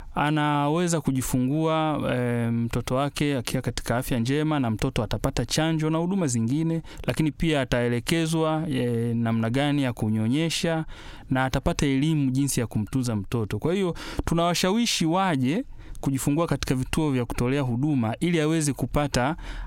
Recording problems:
squashed, flat; heavily

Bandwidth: 16 kHz